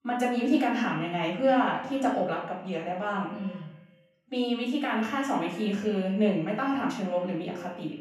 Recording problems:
off-mic speech; far
echo of what is said; noticeable; throughout; 110 ms later, 15 dB below the speech
room echo; noticeable; dies away in 0.5 s

